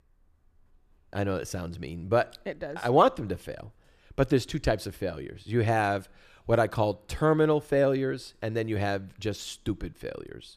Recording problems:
none

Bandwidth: 14.5 kHz